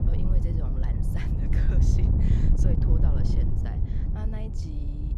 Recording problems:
wind noise on the microphone; heavy; 5 dB above the speech

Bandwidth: 14 kHz